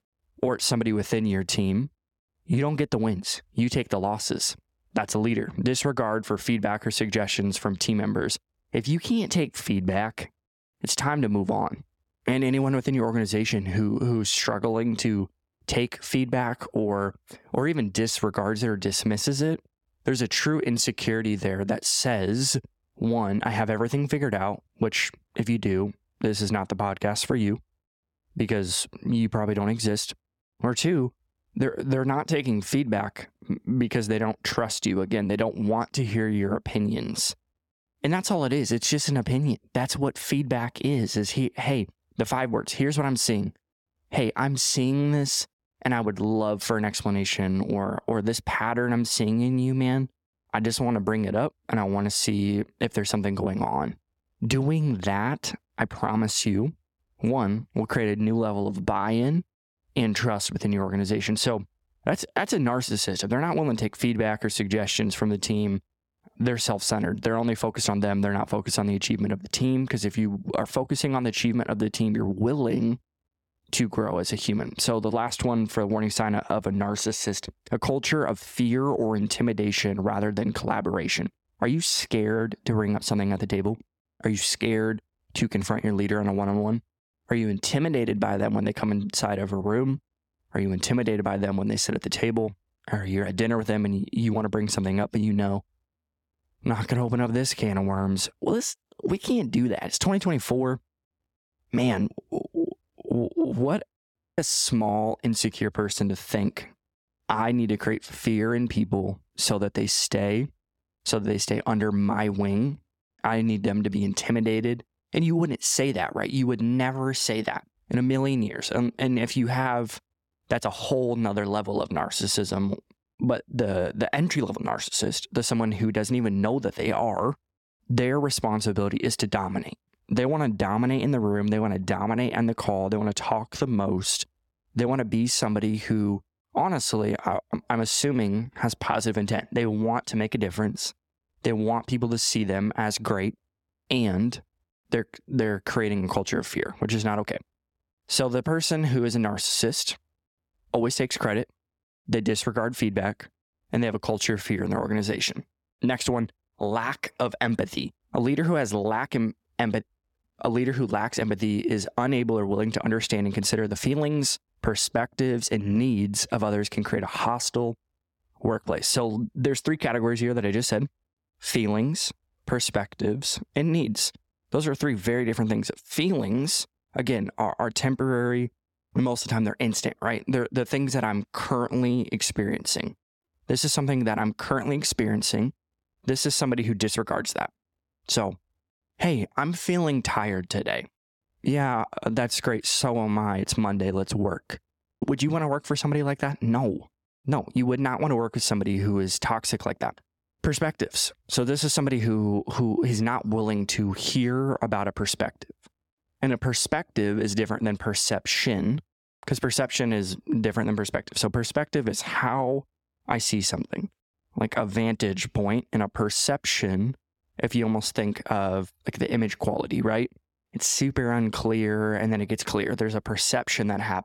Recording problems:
squashed, flat; somewhat

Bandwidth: 17 kHz